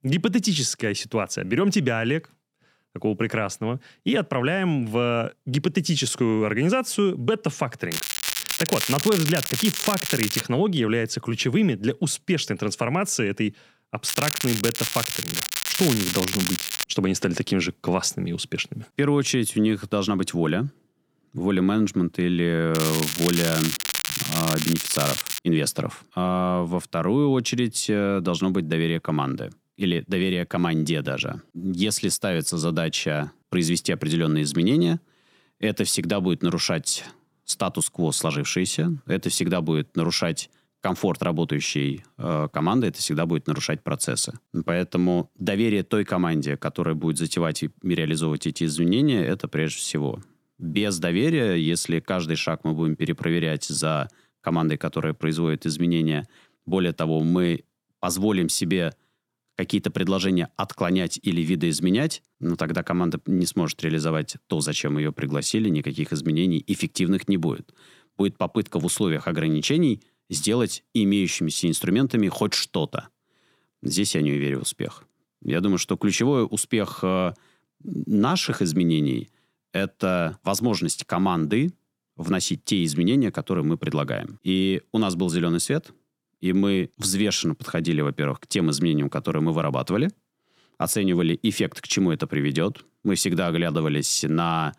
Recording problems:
crackling; loud; from 8 to 10 s, from 14 to 17 s and from 23 to 25 s; 2 dB below the speech

